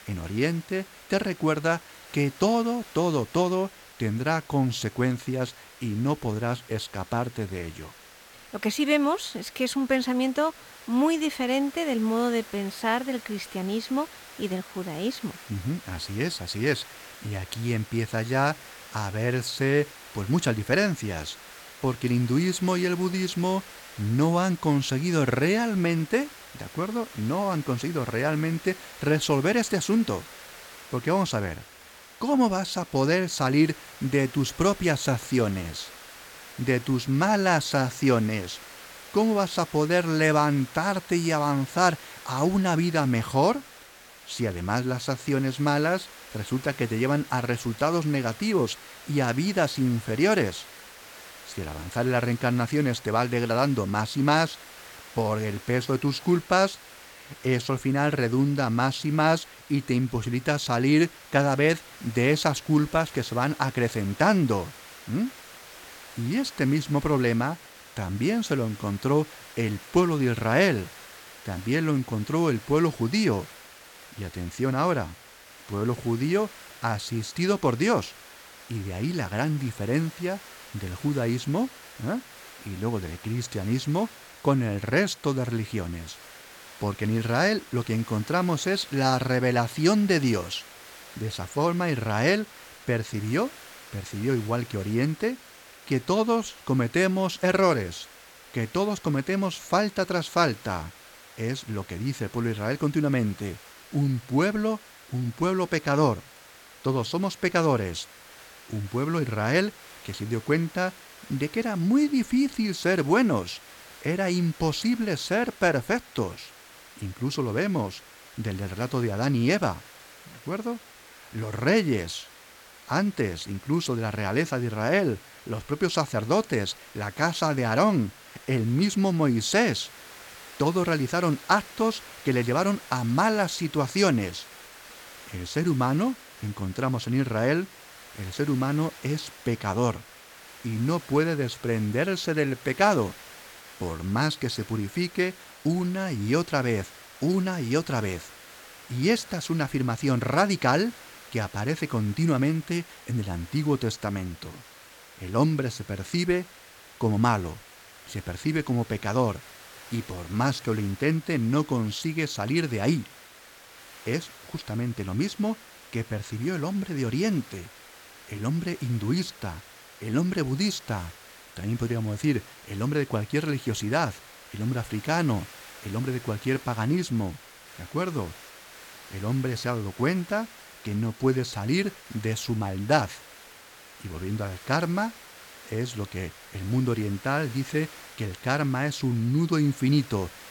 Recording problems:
hiss; noticeable; throughout; 20 dB below the speech

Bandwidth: 17.5 kHz